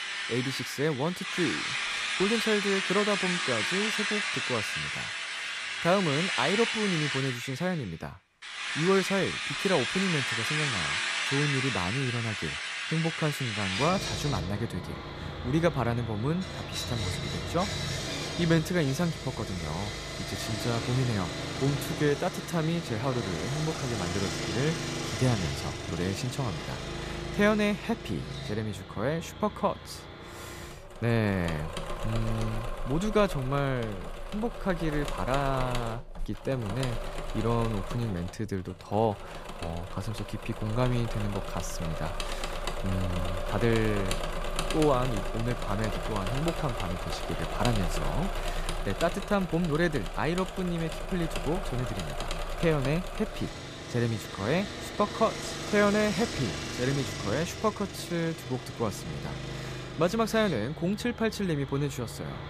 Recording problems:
machinery noise; loud; throughout; 3 dB below the speech

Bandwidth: 14.5 kHz